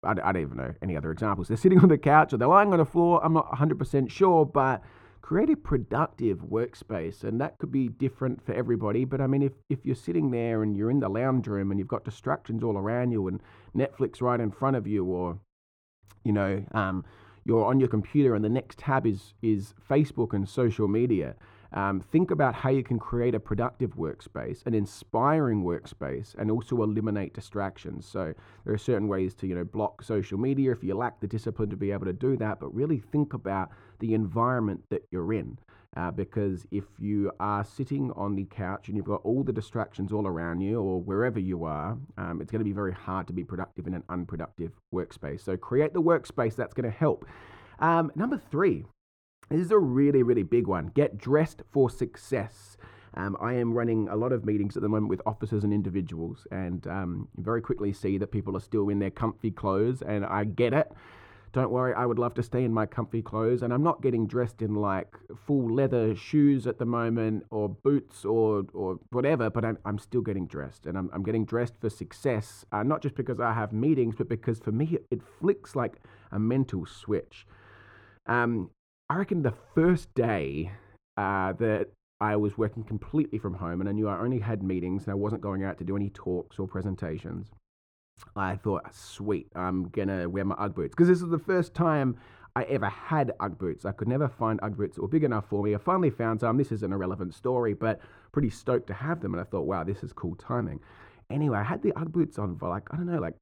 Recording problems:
muffled; very; fading above 2.5 kHz

